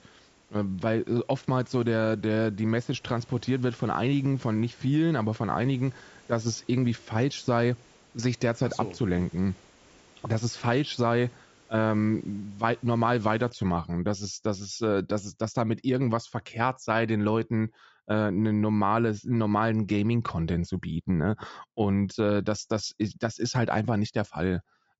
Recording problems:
high frequencies cut off; noticeable; nothing above 8 kHz
hiss; faint; until 14 s; 30 dB below the speech

